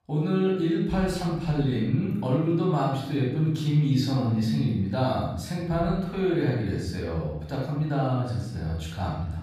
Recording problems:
off-mic speech; far
room echo; noticeable; dies away in 0.9 s

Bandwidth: 14.5 kHz